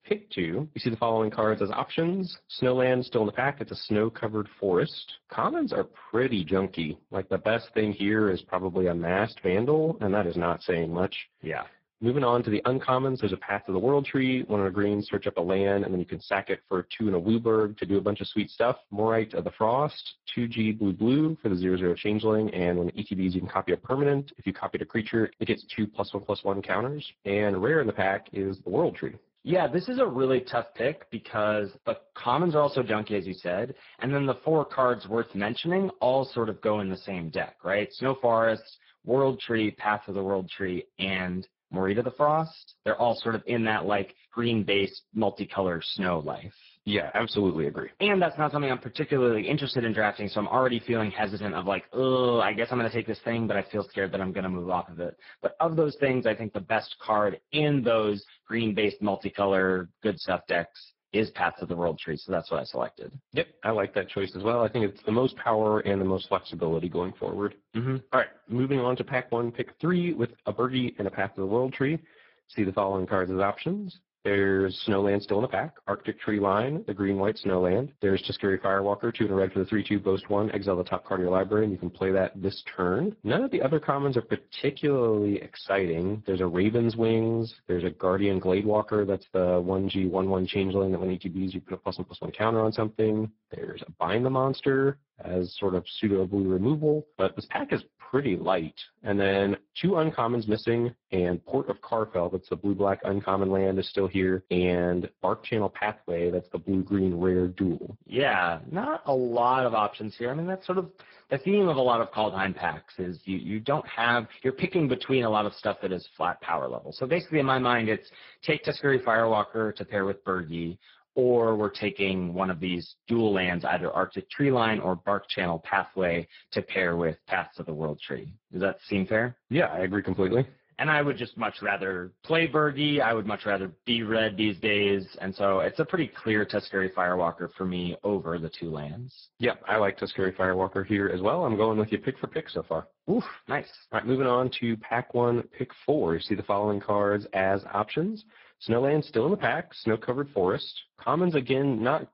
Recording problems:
garbled, watery; badly
high frequencies cut off; noticeable; nothing above 5.5 kHz

